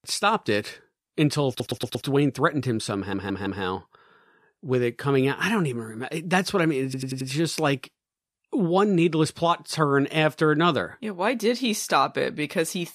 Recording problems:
audio stuttering; at 1.5 s, at 3 s and at 7 s

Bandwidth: 14.5 kHz